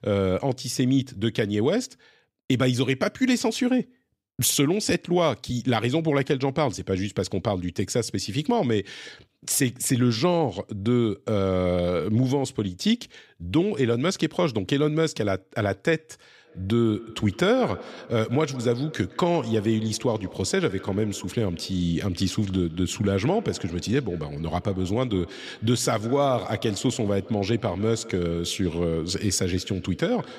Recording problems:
echo of what is said; faint; from 16 s on; 160 ms later, 20 dB below the speech

